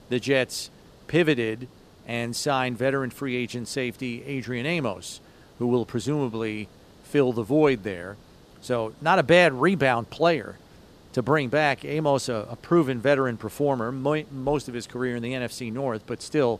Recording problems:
hiss; faint; throughout; 25 dB below the speech

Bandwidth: 14.5 kHz